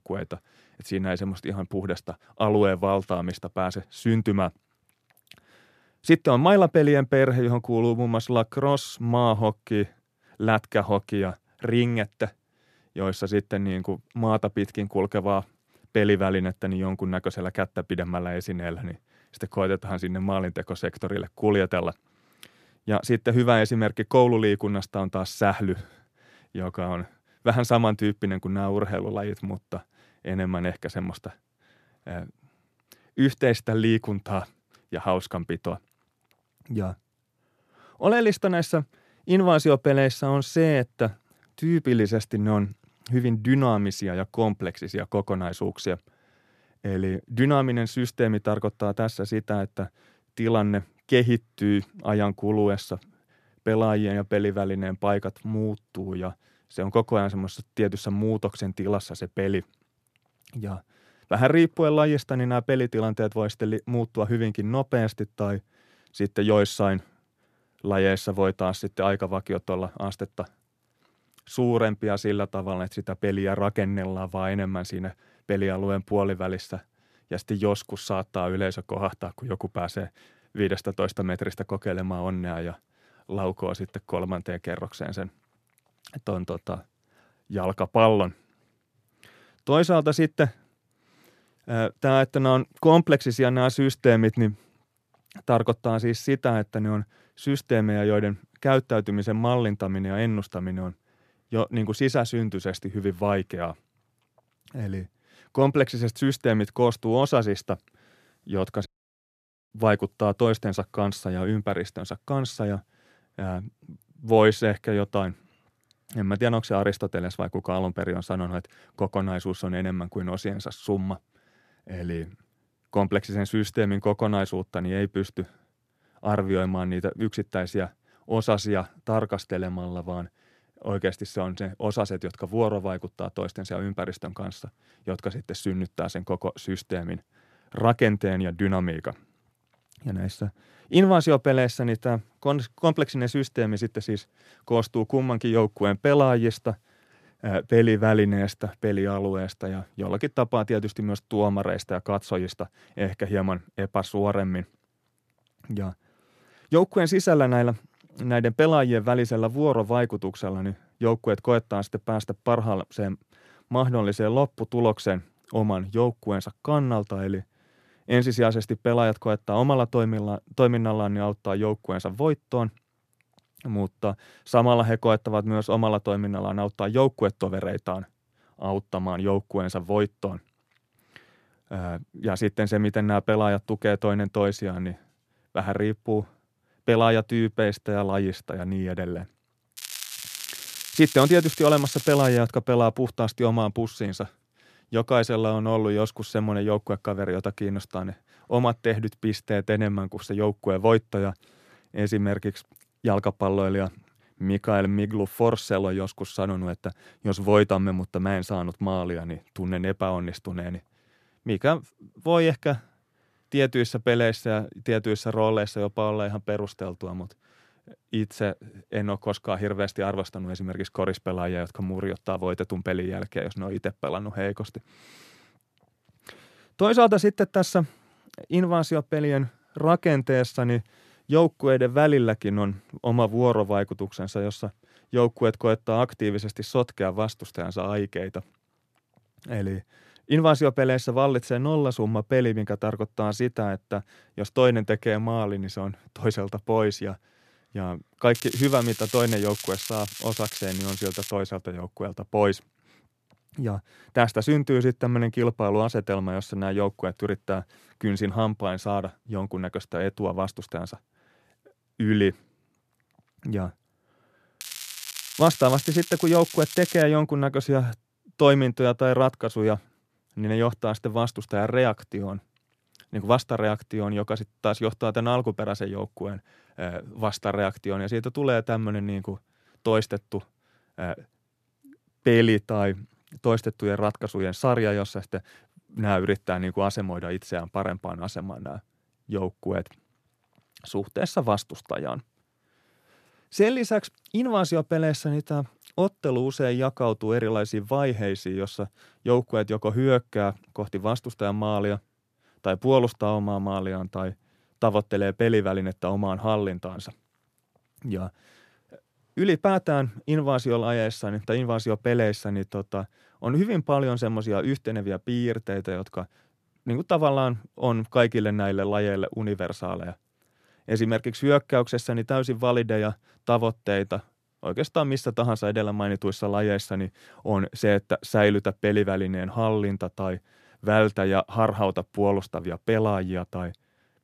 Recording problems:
crackling; loud; from 3:10 to 3:12, from 4:08 to 4:11 and from 4:25 to 4:27; 9 dB below the speech
audio cutting out; at 1:49 for 1 s

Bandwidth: 14.5 kHz